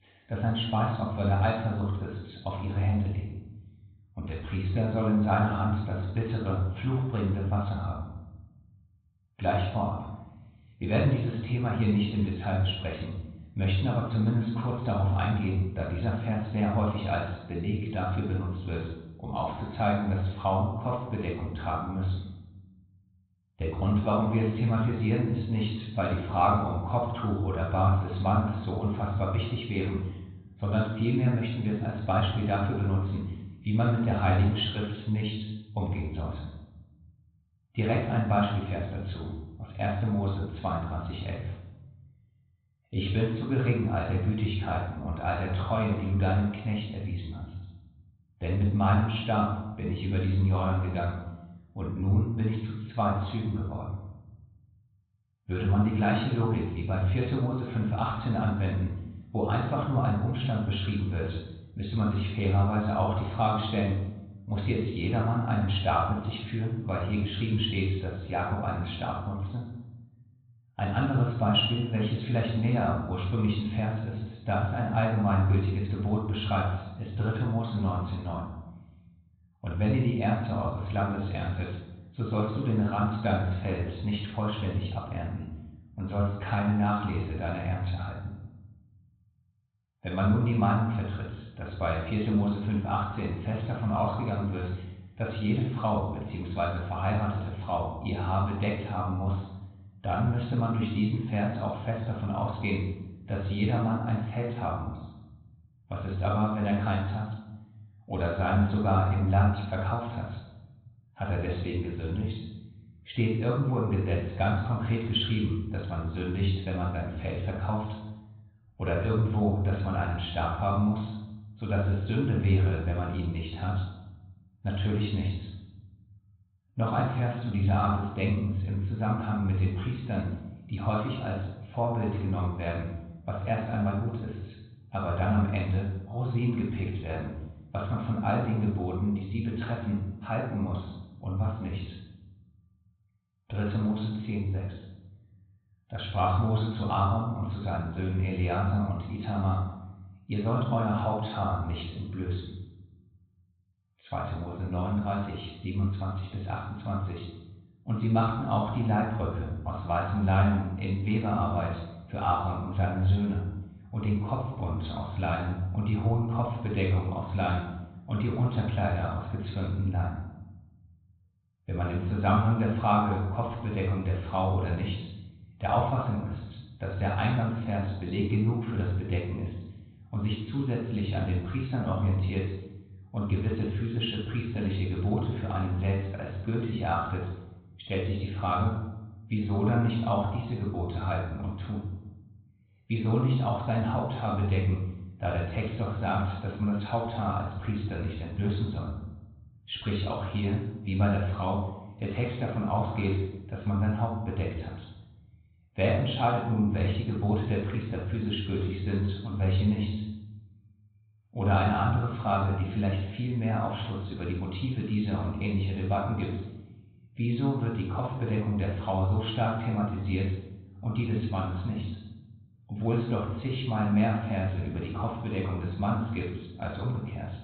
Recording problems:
high frequencies cut off; severe; nothing above 4 kHz
room echo; noticeable; dies away in 1 s
off-mic speech; somewhat distant

